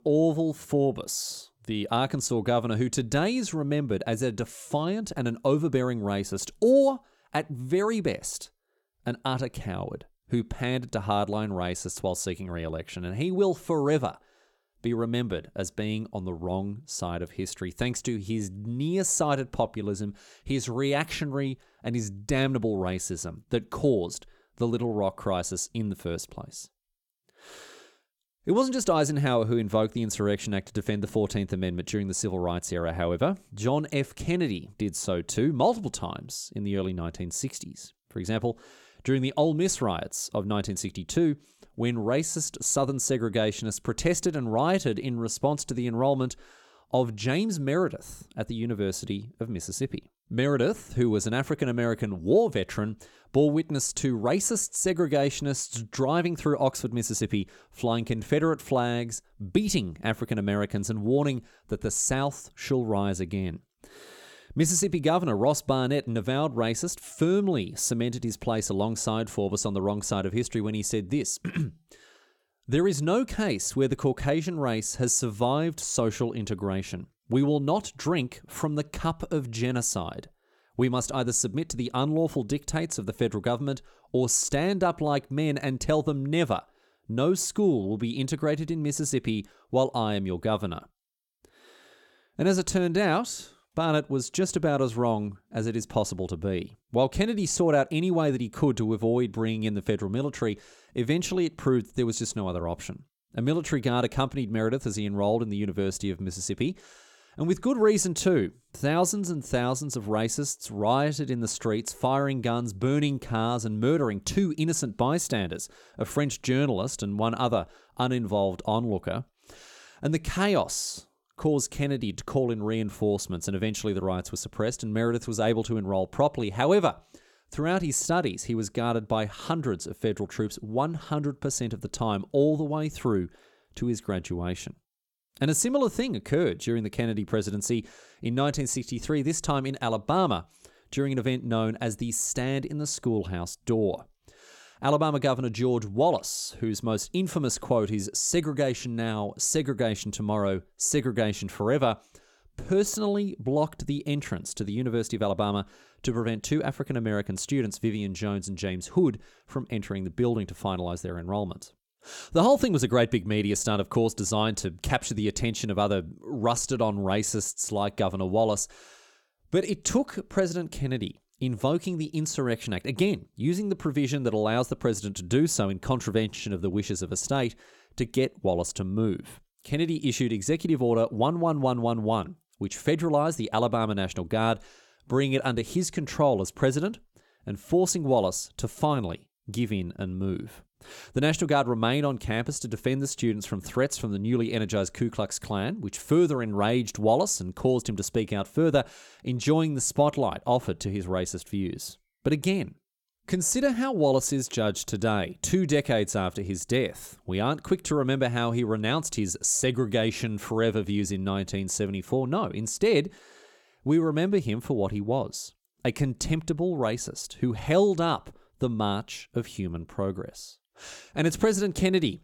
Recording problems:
none

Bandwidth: 17.5 kHz